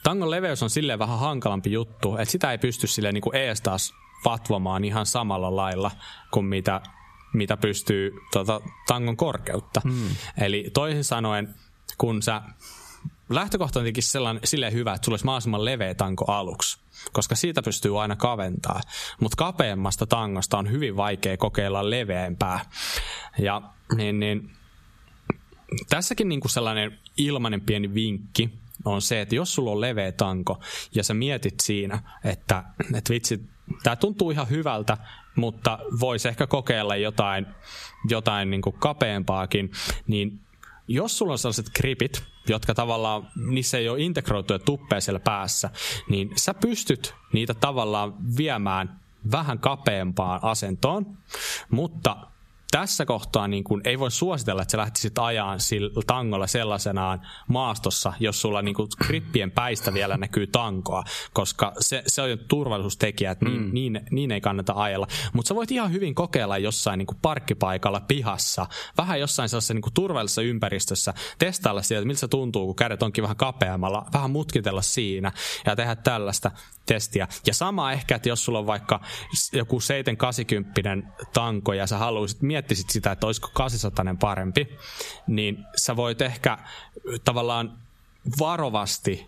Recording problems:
squashed, flat; heavily

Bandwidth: 14.5 kHz